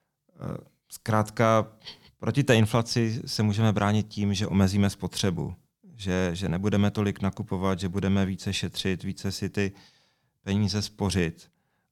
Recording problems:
none

